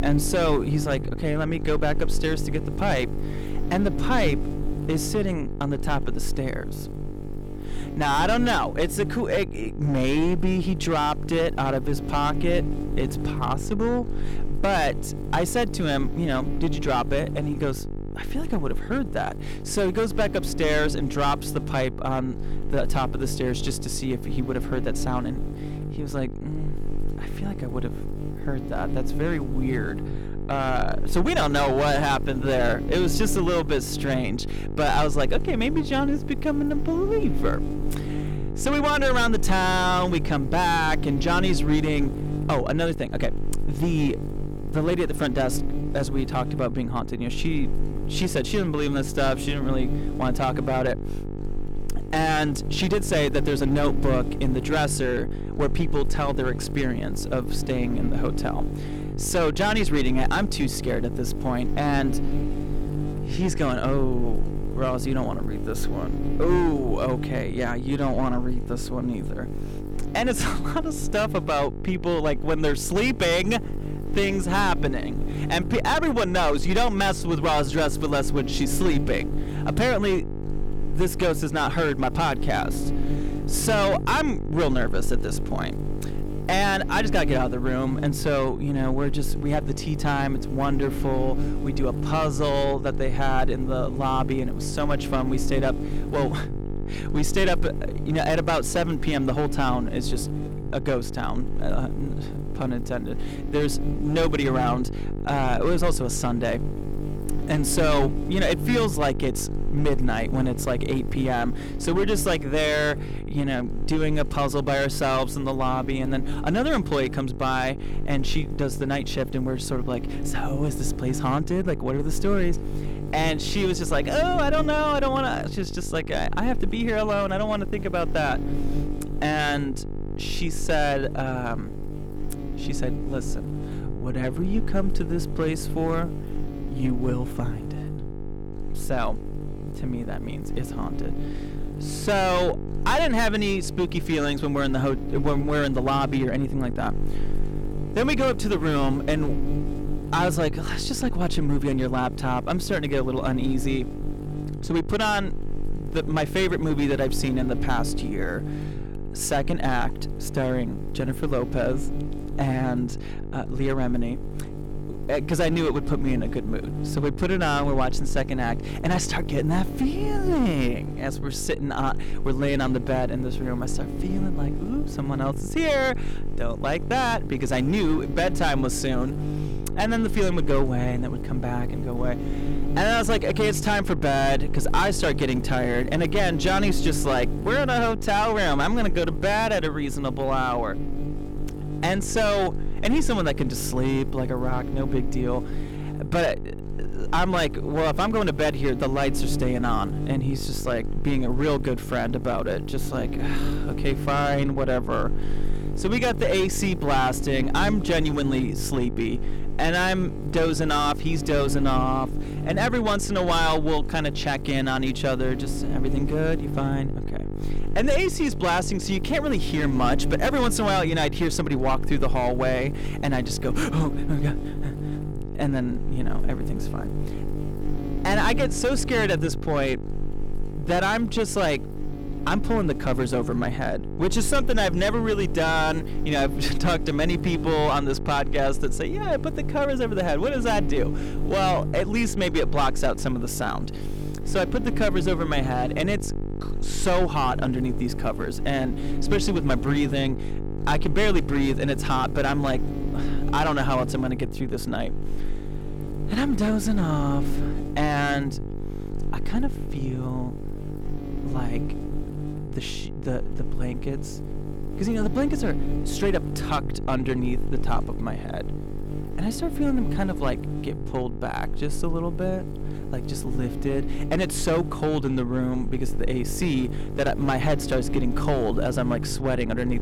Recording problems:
distortion; slight; 8% of the sound clipped
electrical hum; noticeable; throughout; 50 Hz, 10 dB below the speech

